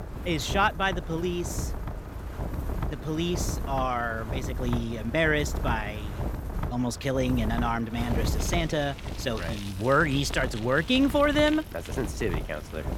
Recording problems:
traffic noise; noticeable; throughout; 15 dB below the speech
wind noise on the microphone; occasional gusts; 15 dB below the speech

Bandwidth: 18 kHz